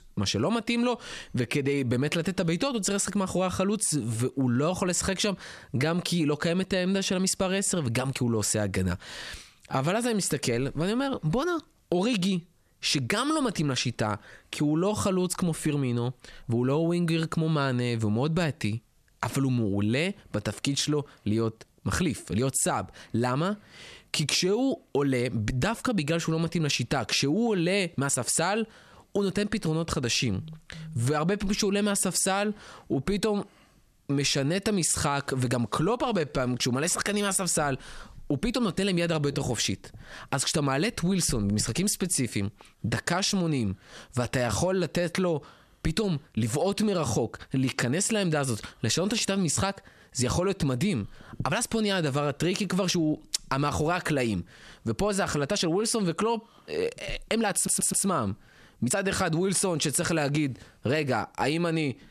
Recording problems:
squashed, flat; somewhat
uneven, jittery; strongly; from 1.5 to 59 s
audio stuttering; at 58 s

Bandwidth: 13.5 kHz